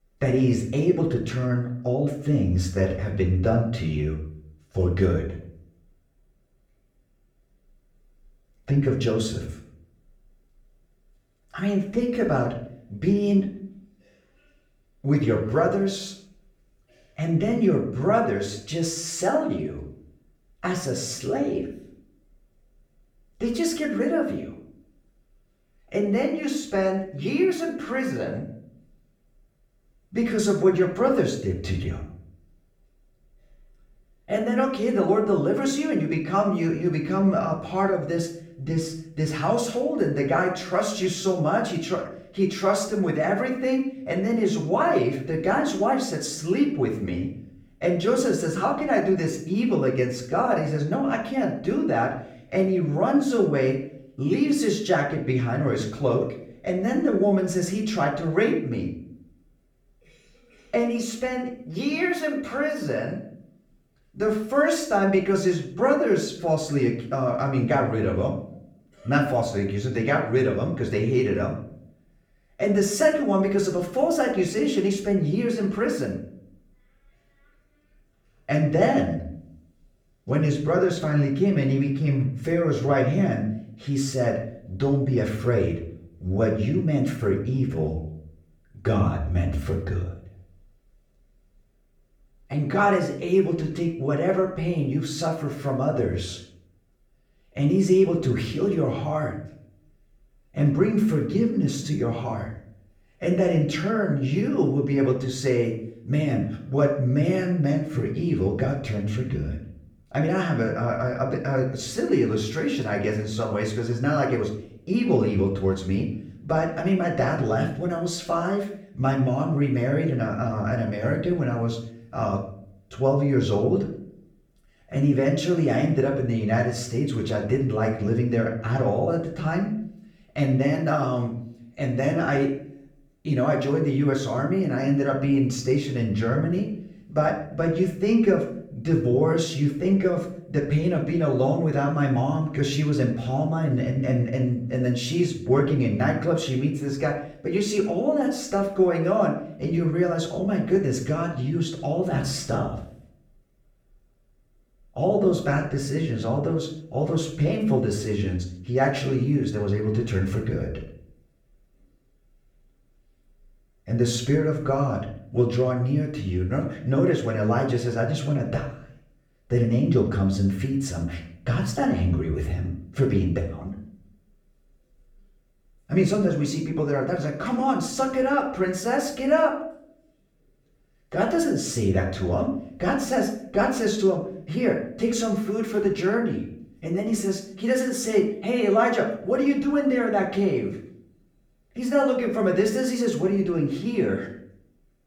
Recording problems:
off-mic speech; far
room echo; slight; dies away in 0.5 s

